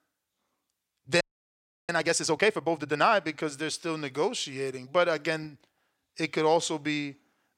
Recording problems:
audio freezing; at 1 s for 0.5 s

